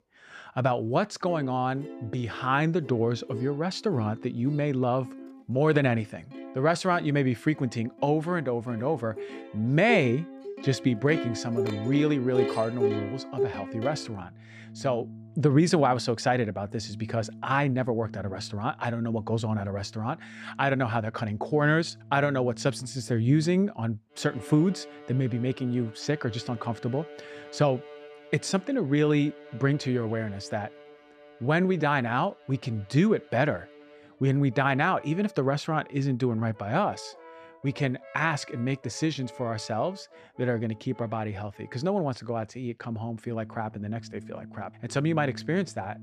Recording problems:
background music; noticeable; throughout; 15 dB below the speech

